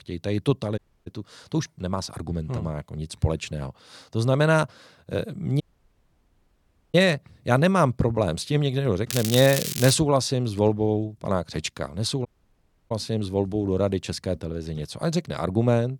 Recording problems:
crackling; loud; at 9 s; 4 dB below the speech
audio cutting out; at 1 s, at 5.5 s for 1.5 s and at 12 s for 0.5 s

